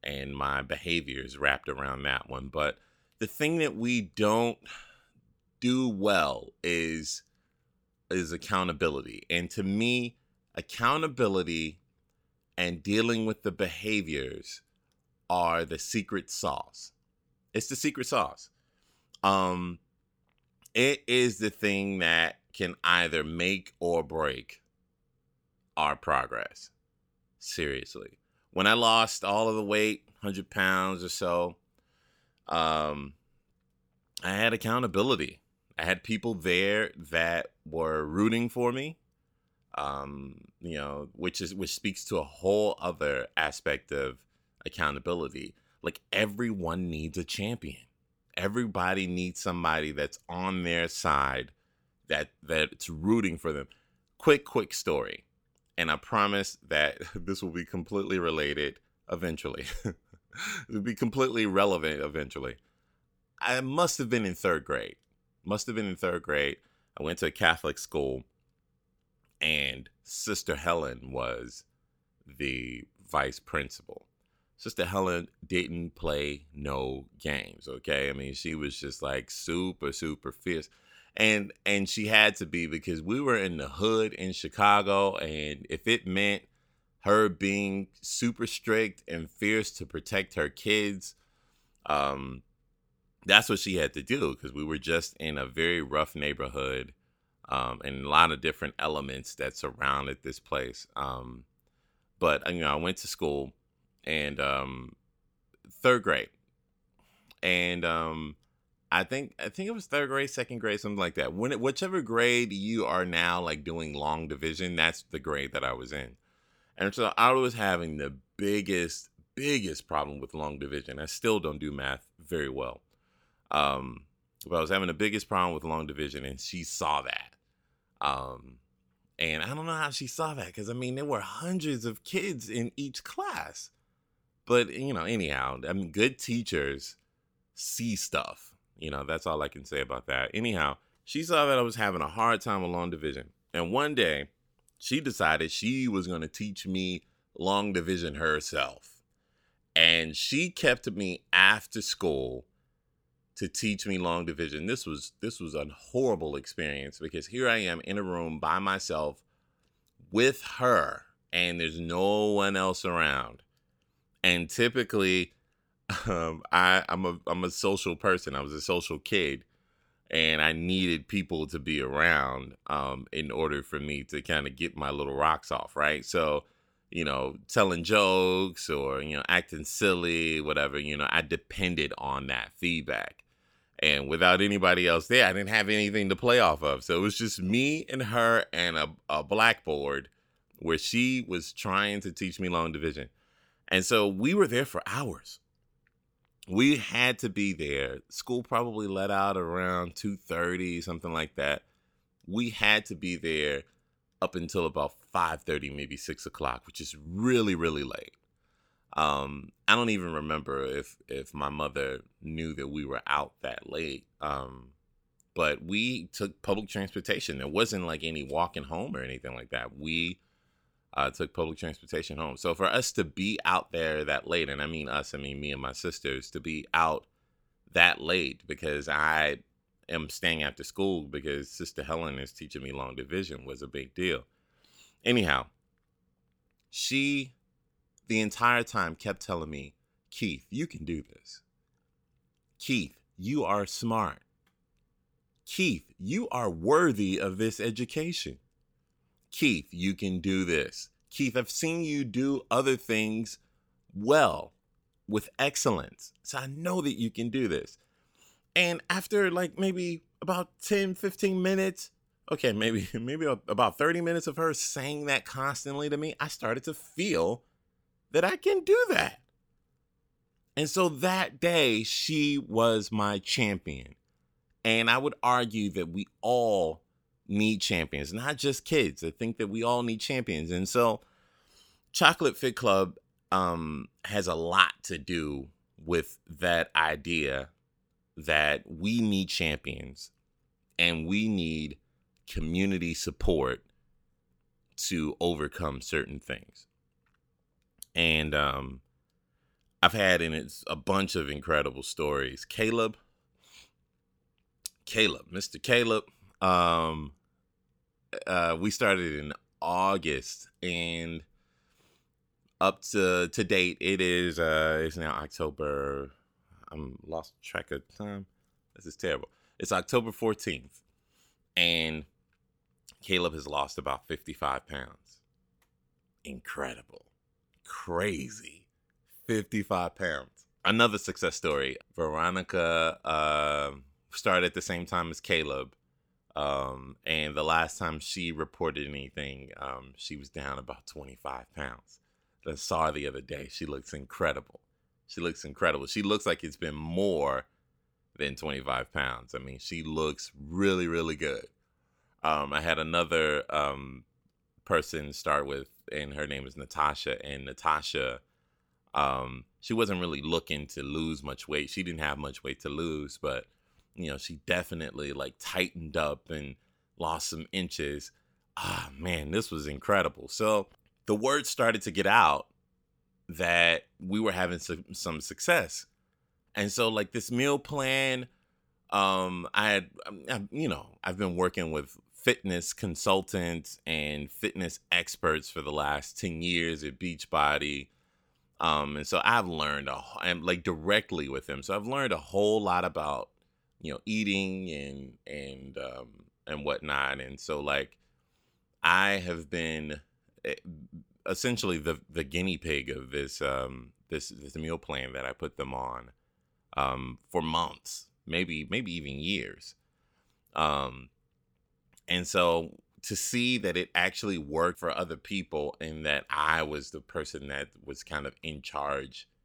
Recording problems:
none

